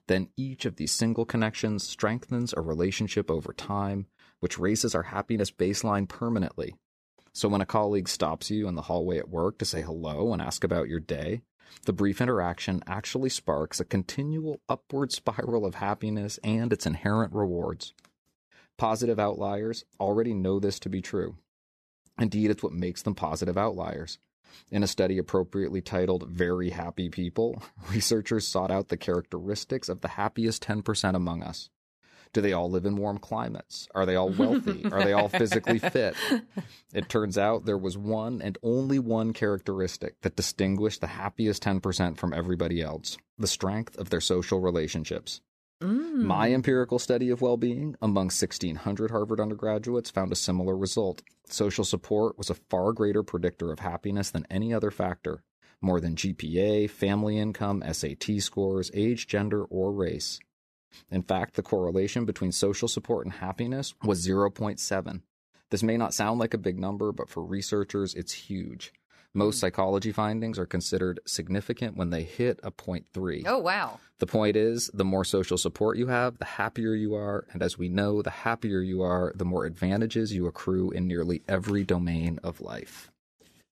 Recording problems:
none

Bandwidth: 14.5 kHz